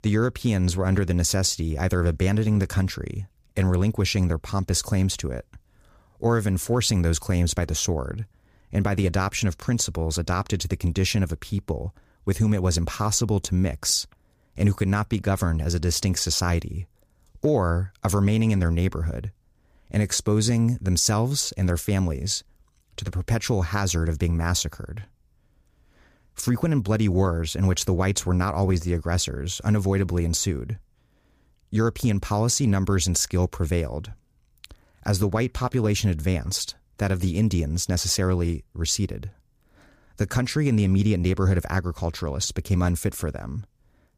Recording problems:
none

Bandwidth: 15 kHz